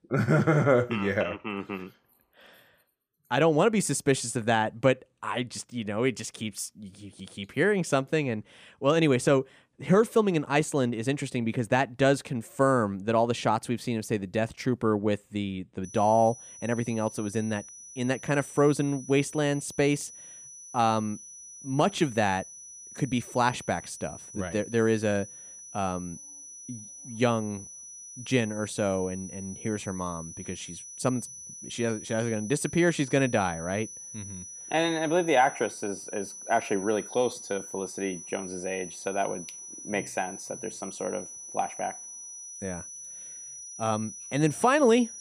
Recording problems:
high-pitched whine; noticeable; from 16 s on; 6 kHz, 15 dB below the speech

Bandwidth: 15 kHz